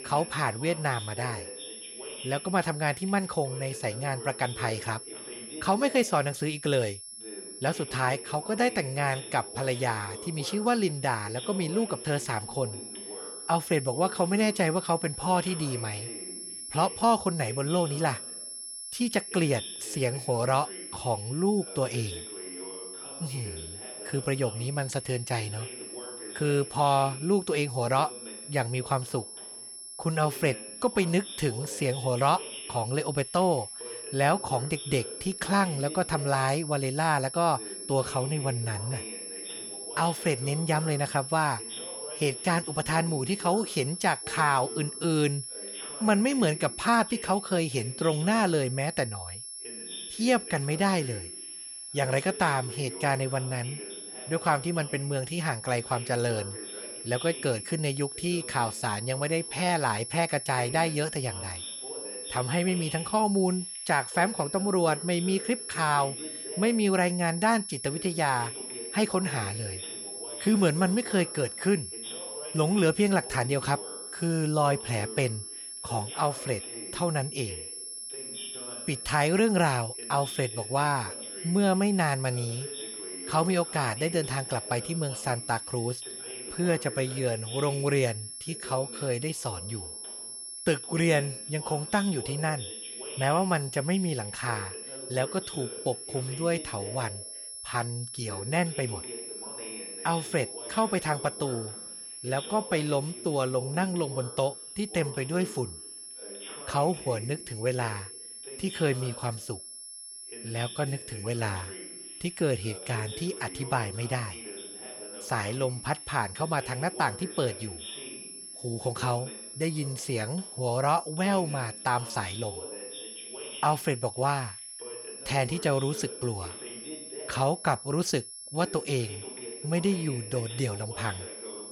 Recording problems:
high-pitched whine; loud; throughout; 11 kHz, 9 dB below the speech
voice in the background; noticeable; throughout; 15 dB below the speech

